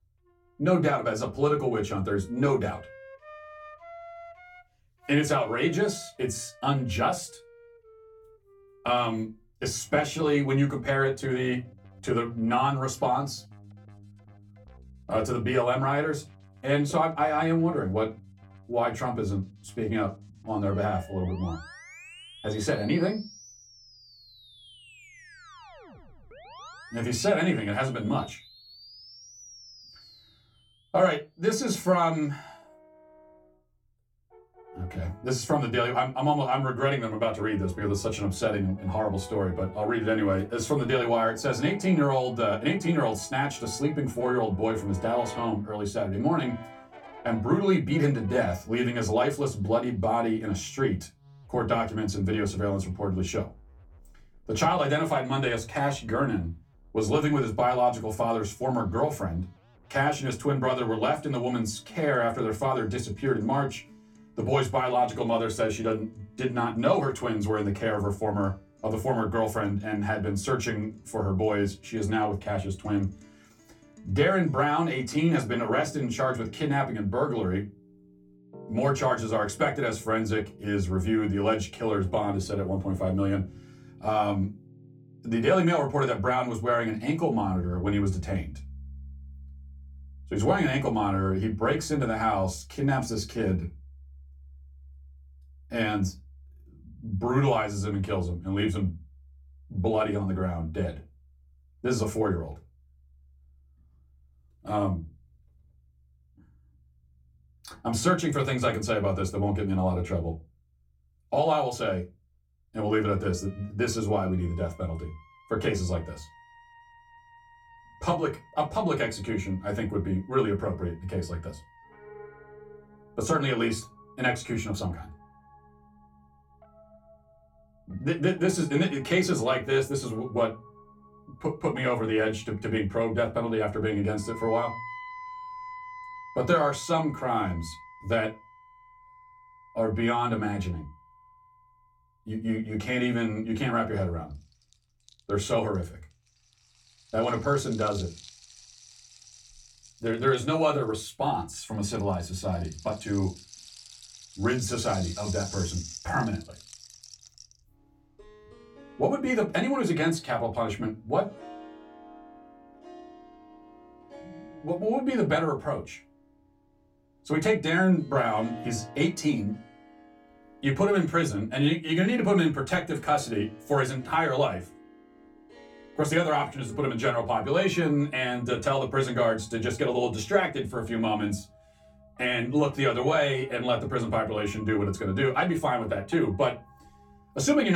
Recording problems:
off-mic speech; far
room echo; very slight; dies away in 0.2 s
background music; faint; throughout; 20 dB below the speech
abrupt cut into speech; at the end

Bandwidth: 17.5 kHz